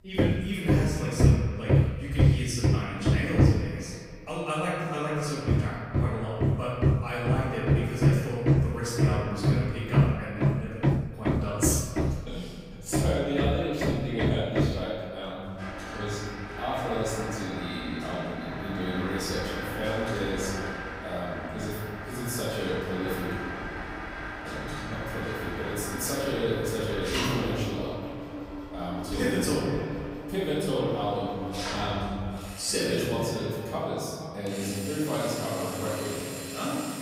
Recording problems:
room echo; strong; dies away in 1.6 s
off-mic speech; far
echo of what is said; noticeable; throughout; 470 ms later, 15 dB below the speech
machinery noise; very loud; throughout; 2 dB above the speech

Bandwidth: 15.5 kHz